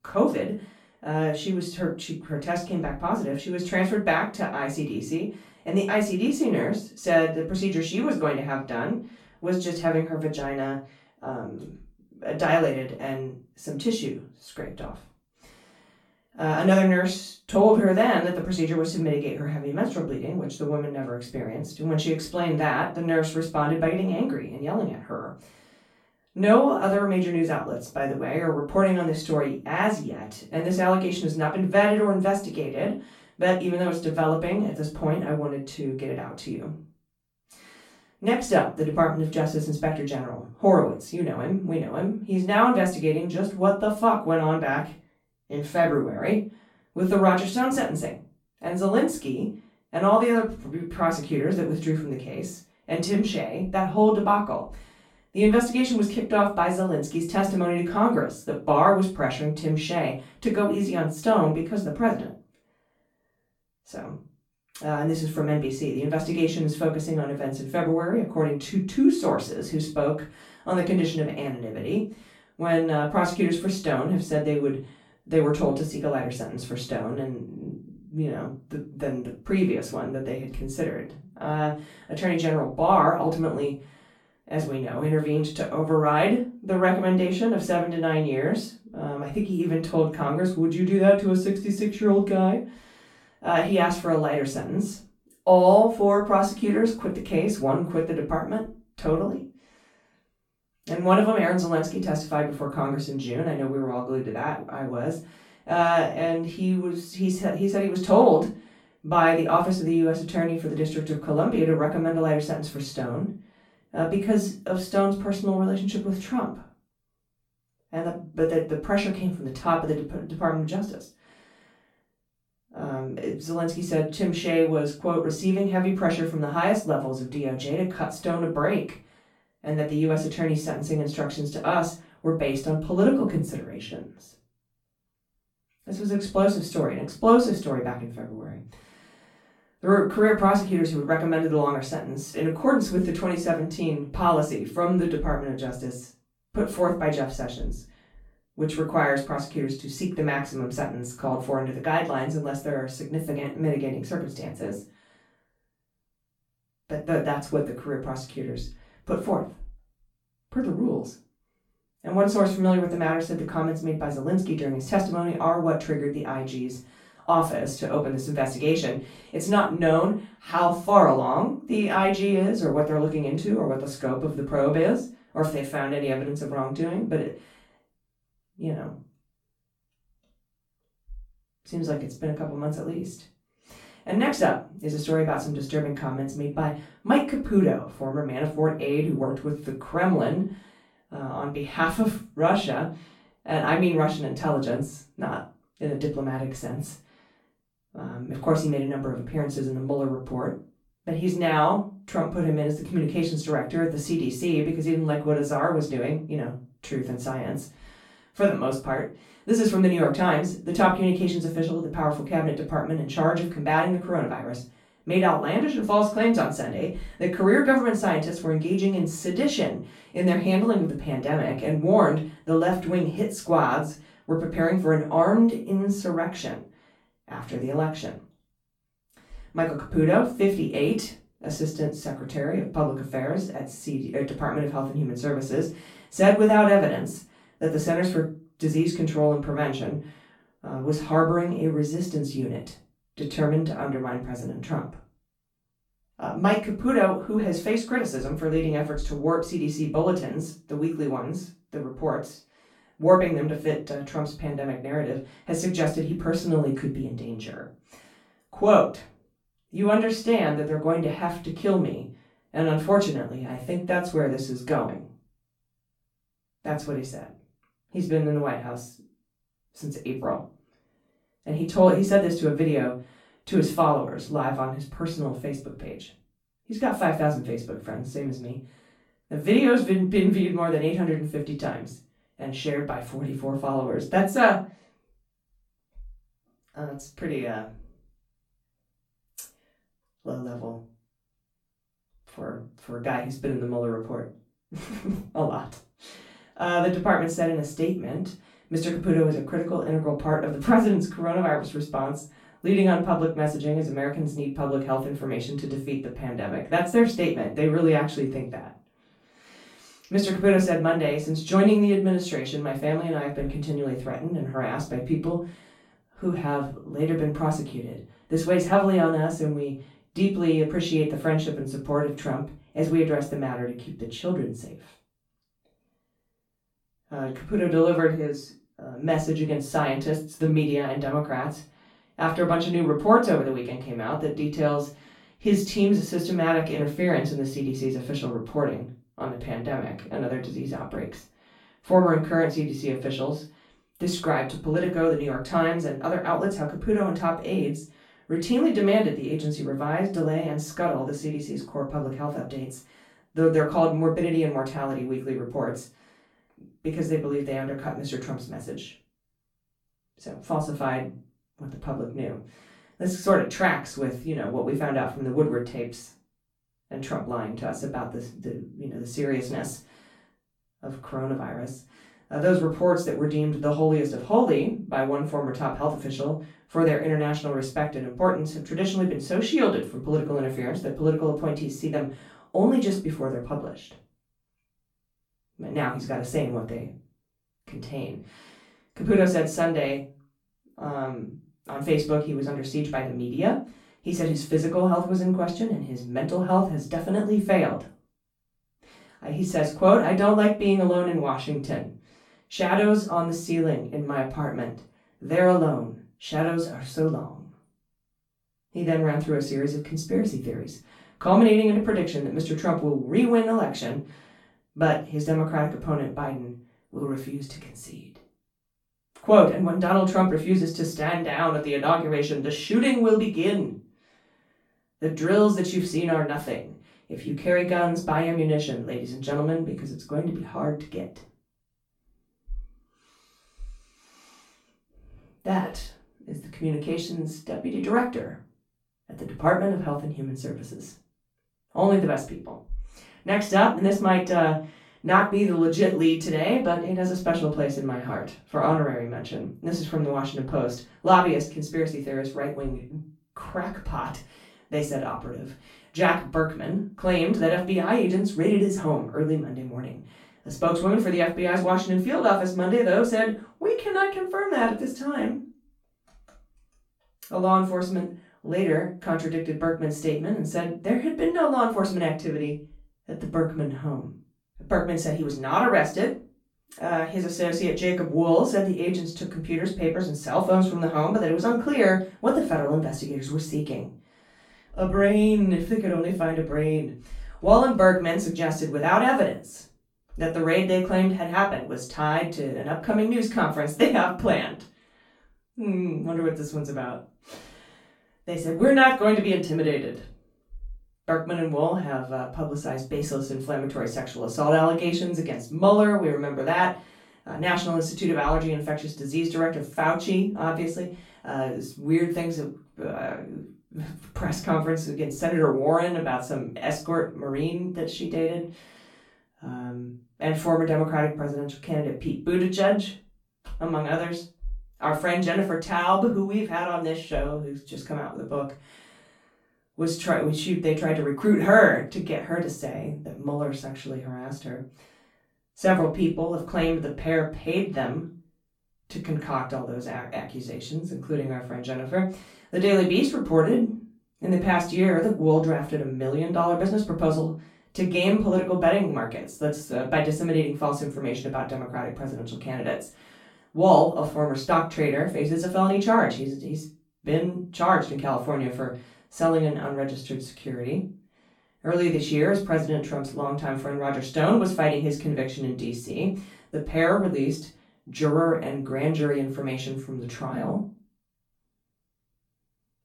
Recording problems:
off-mic speech; far
room echo; slight; dies away in 0.3 s

